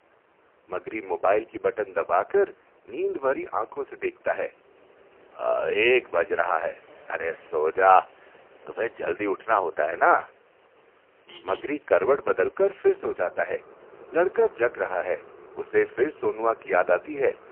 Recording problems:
phone-call audio; poor line; nothing above 3 kHz
traffic noise; faint; throughout; 25 dB below the speech

